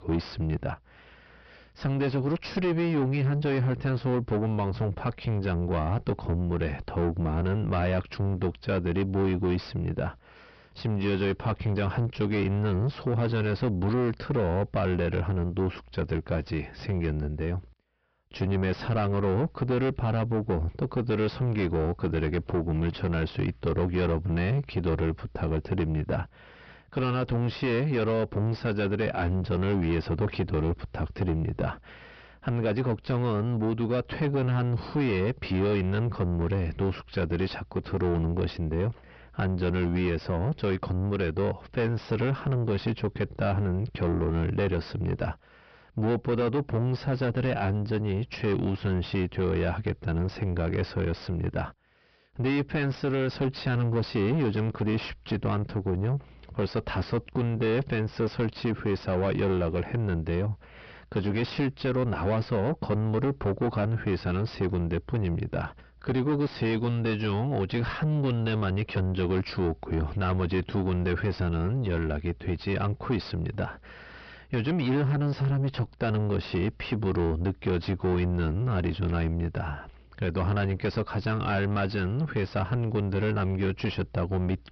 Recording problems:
distortion; heavy; 5 dB below the speech
high frequencies cut off; noticeable; nothing above 5.5 kHz

